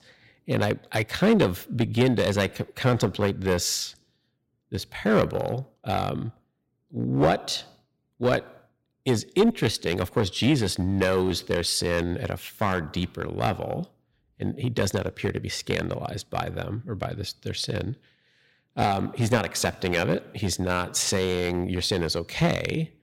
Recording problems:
distortion; slight; 3% of the sound clipped

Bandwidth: 16 kHz